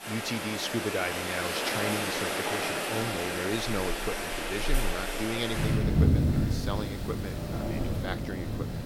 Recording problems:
rain or running water; very loud; throughout; 5 dB above the speech

